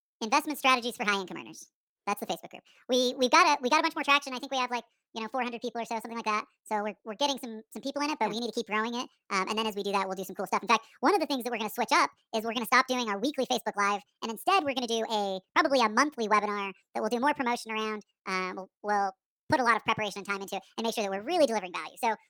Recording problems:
wrong speed and pitch; too fast and too high; 1.6 times normal speed

